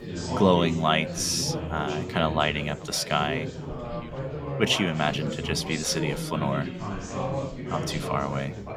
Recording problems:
chatter from many people; loud; throughout; 6 dB below the speech

